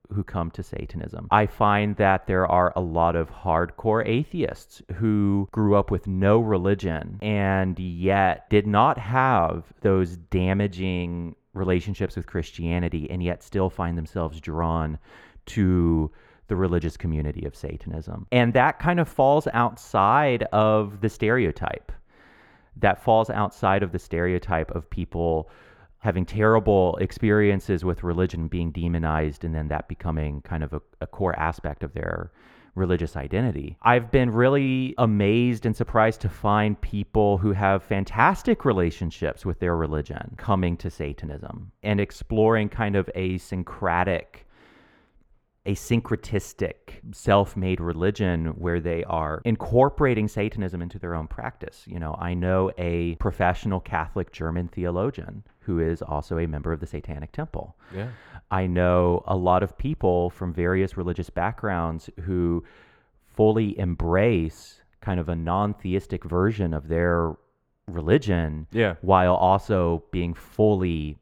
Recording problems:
muffled; slightly; fading above 3 kHz

